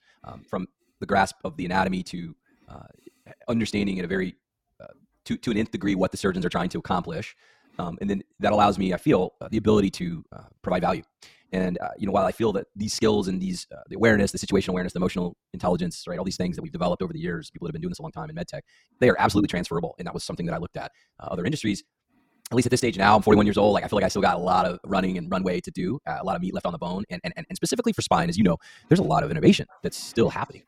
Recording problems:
wrong speed, natural pitch; too fast; 1.7 times normal speed

